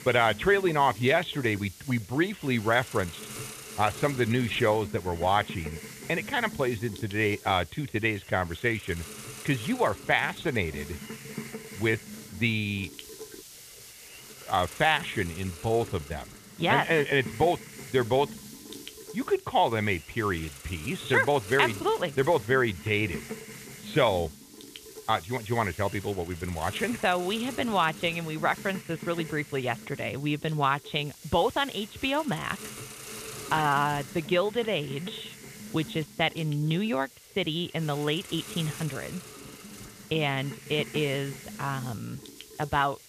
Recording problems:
high frequencies cut off; severe; nothing above 4 kHz
hiss; noticeable; throughout; 15 dB below the speech

